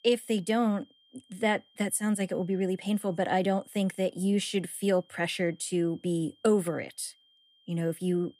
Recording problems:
high-pitched whine; faint; throughout; 3 kHz, 30 dB below the speech

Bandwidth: 15 kHz